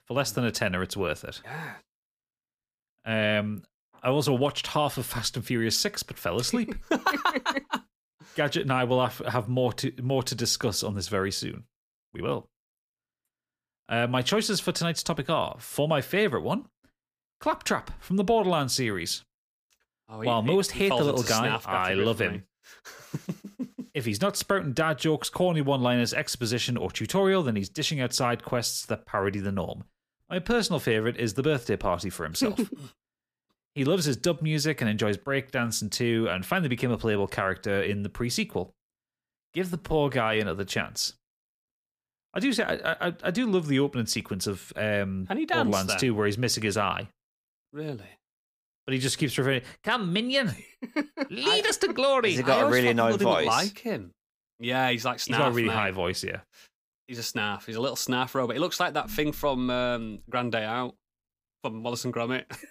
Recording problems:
uneven, jittery; slightly; from 5.5 s to 1:00

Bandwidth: 15 kHz